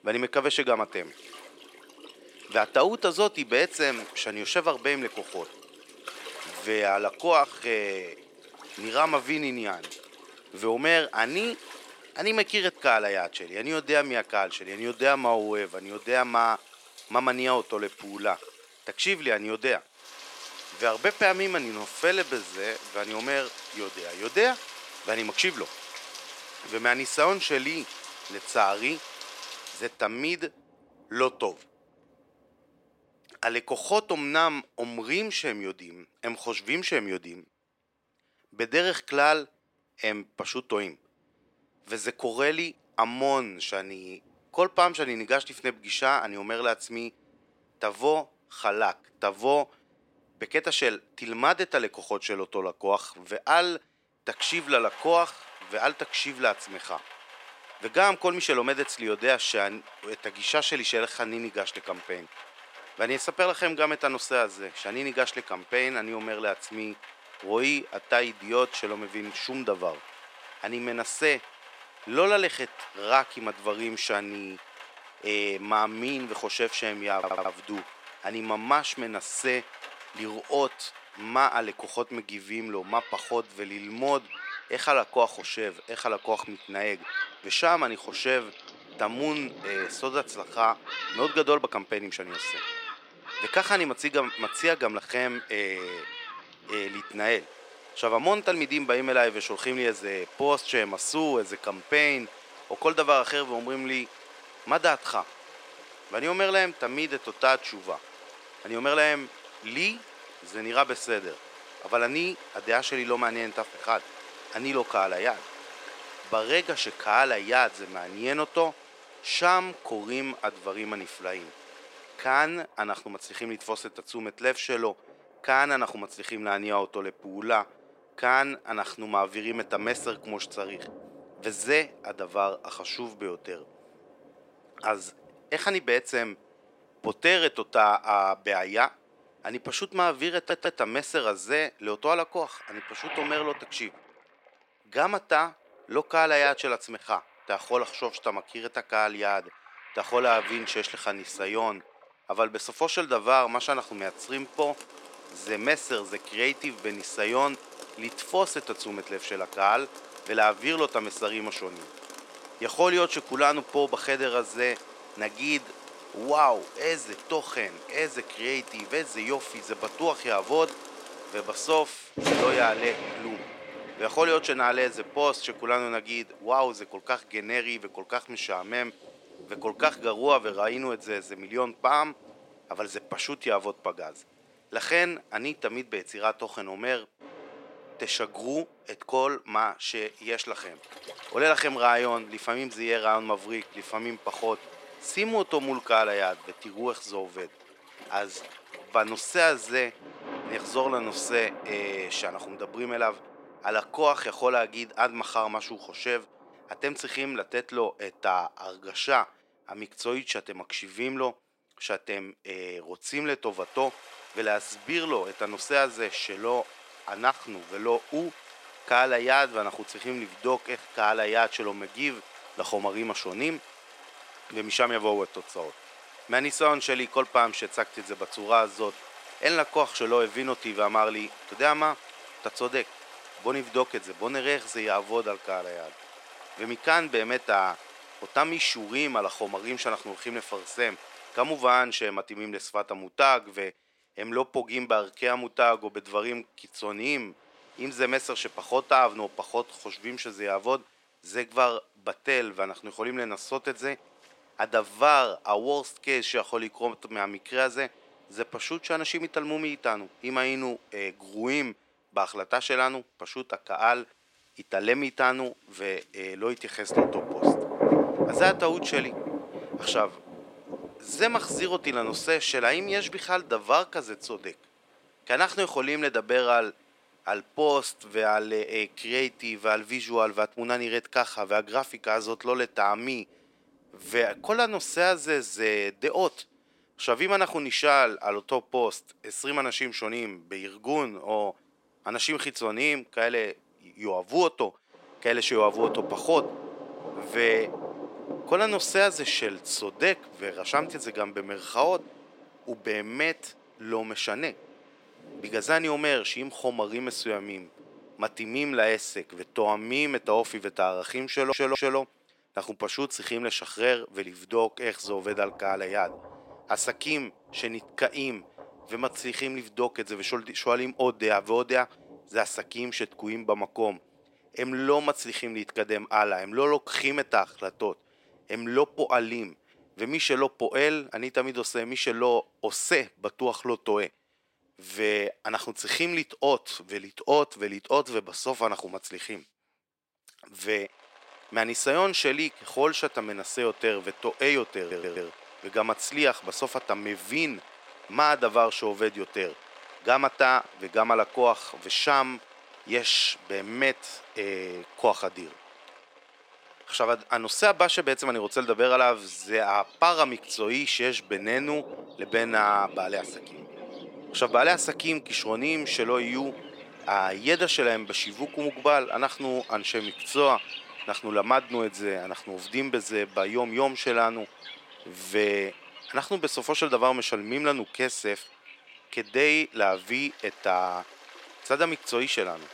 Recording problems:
thin; somewhat; fading below 500 Hz
rain or running water; noticeable; throughout; 15 dB below the speech
audio stuttering; 4 times, first at 1:17

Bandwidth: 16 kHz